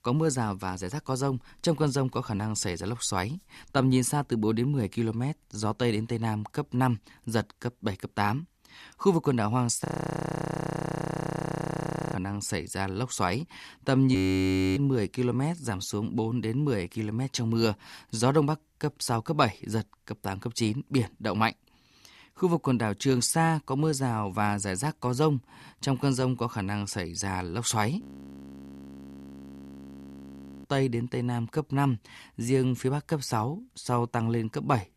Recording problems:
audio freezing; at 10 s for 2.5 s, at 14 s for 0.5 s and at 28 s for 2.5 s

